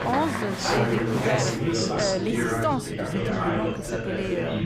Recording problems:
chatter from many people; very loud; throughout; 3 dB above the speech

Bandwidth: 15.5 kHz